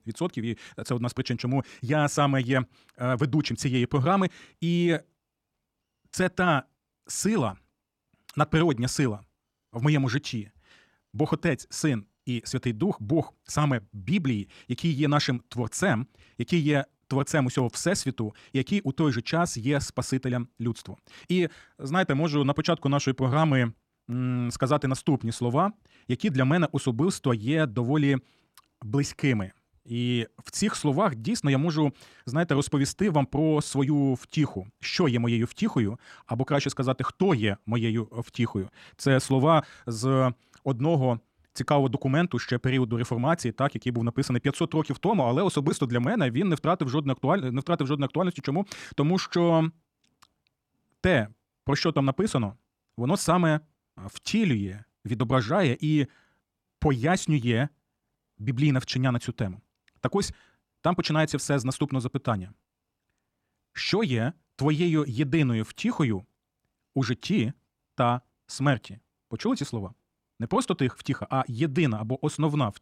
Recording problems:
wrong speed, natural pitch; too fast; 1.6 times normal speed

